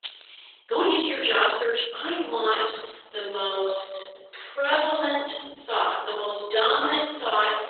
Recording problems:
off-mic speech; far
garbled, watery; badly; nothing above 4 kHz
room echo; noticeable; dies away in 1 s
thin; somewhat; fading below 400 Hz
jangling keys; faint; at the start; peak 15 dB below the speech
uneven, jittery; strongly; from 0.5 to 5 s

